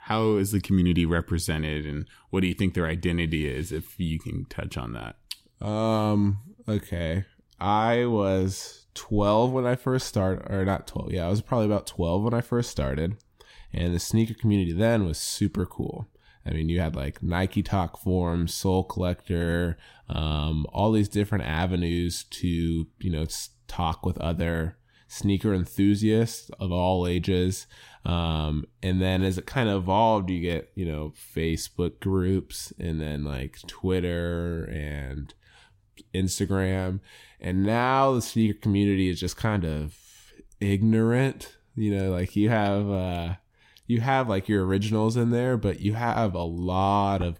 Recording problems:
none

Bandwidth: 16 kHz